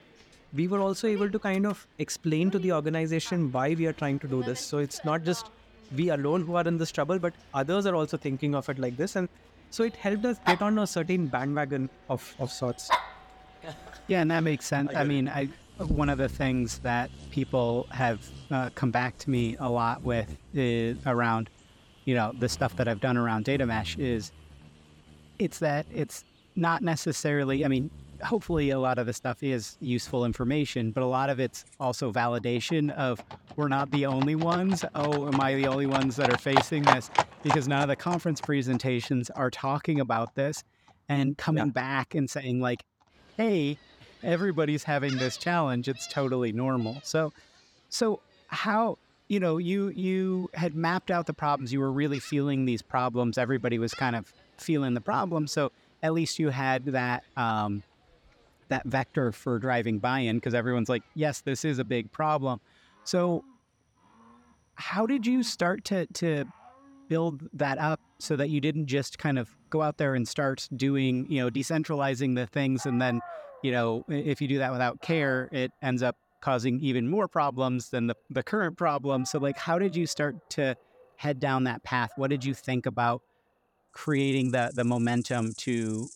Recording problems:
animal sounds; loud; throughout; 8 dB below the speech

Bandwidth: 17.5 kHz